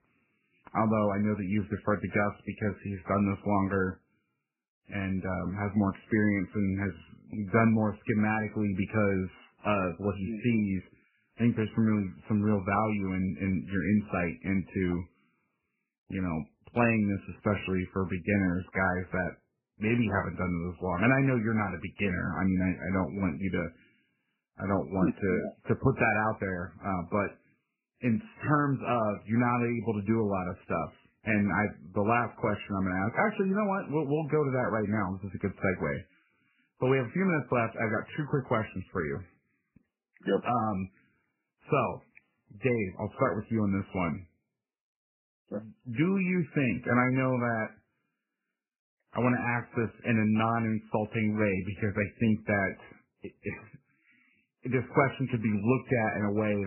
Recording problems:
garbled, watery; badly; nothing above 2.5 kHz
abrupt cut into speech; at the end

